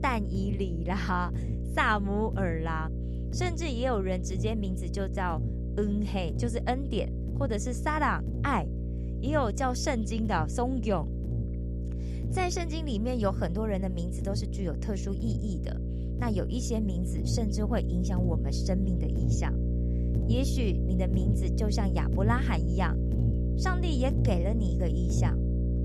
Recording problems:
electrical hum; loud; throughout; 60 Hz, 9 dB below the speech

